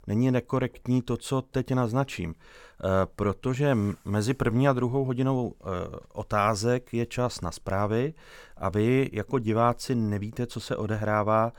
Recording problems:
none

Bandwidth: 17 kHz